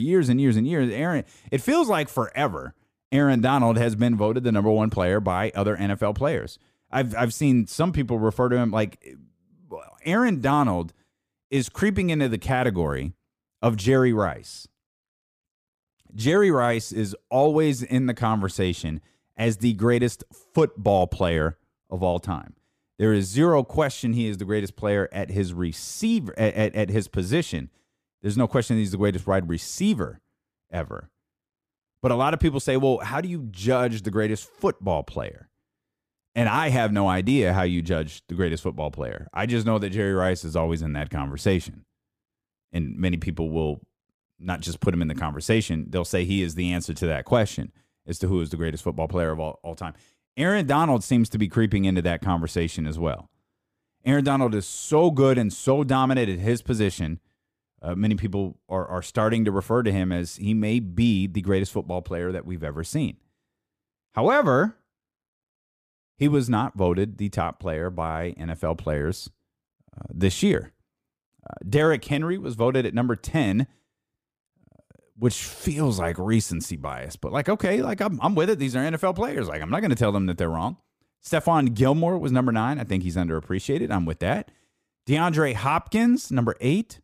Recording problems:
abrupt cut into speech; at the start

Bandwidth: 15 kHz